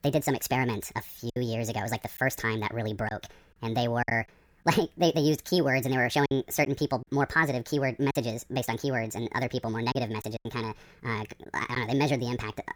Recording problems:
wrong speed and pitch; too fast and too high; 1.5 times normal speed
choppy; occasionally; 4% of the speech affected

